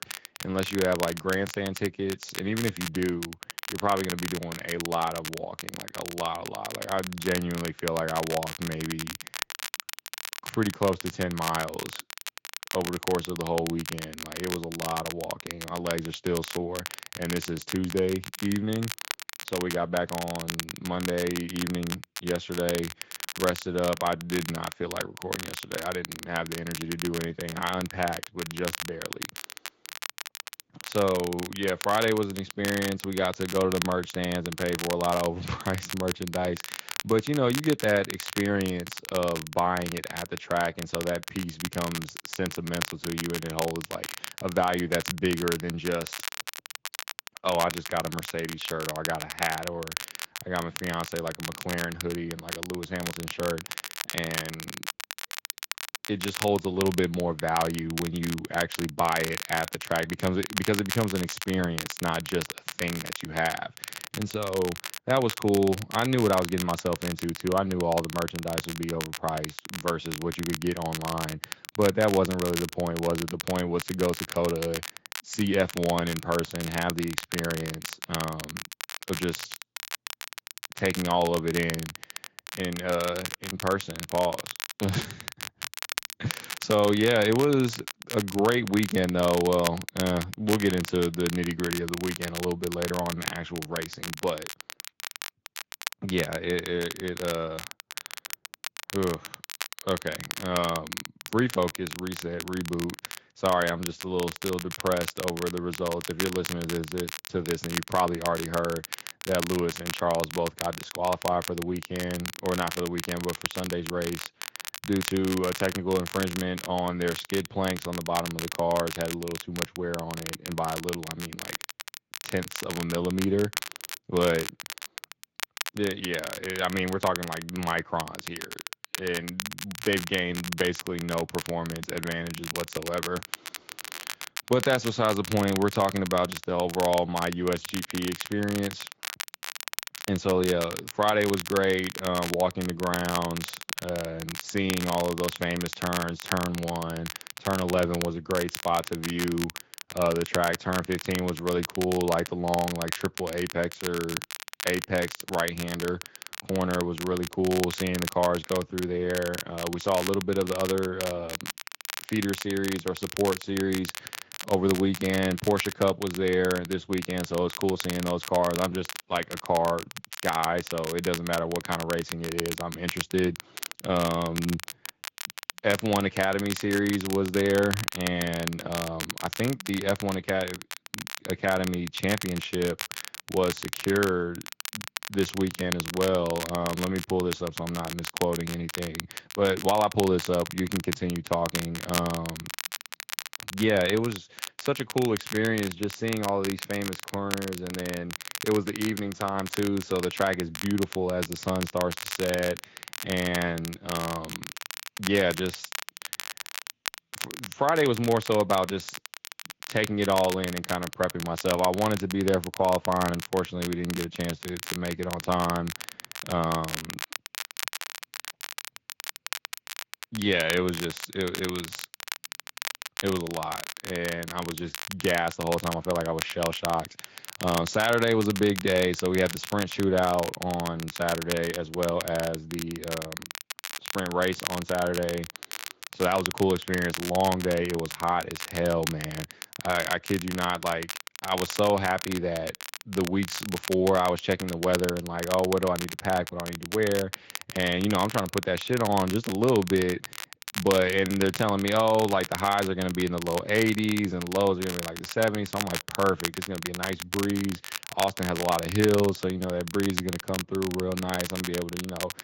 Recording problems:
garbled, watery; slightly; nothing above 7.5 kHz
crackle, like an old record; loud; 8 dB below the speech

